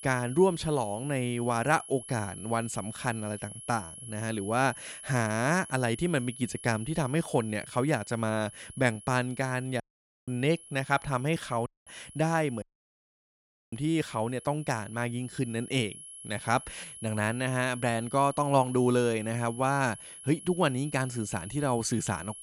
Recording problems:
high-pitched whine; noticeable; throughout; 11 kHz, 15 dB below the speech
audio cutting out; at 10 s, at 12 s and at 13 s for 1 s

